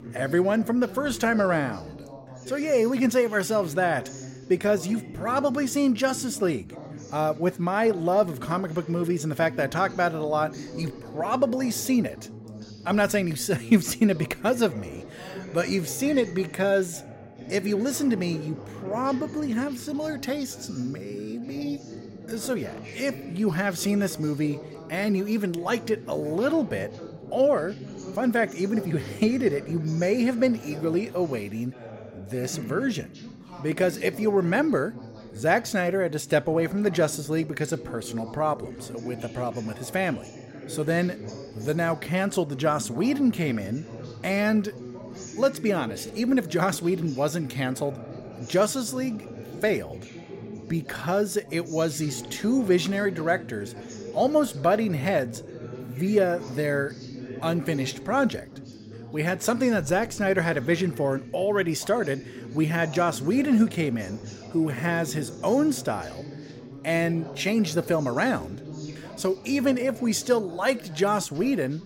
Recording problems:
background chatter; noticeable; throughout; 3 voices, 15 dB below the speech

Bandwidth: 16 kHz